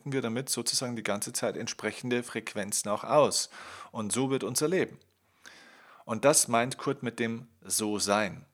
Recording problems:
none

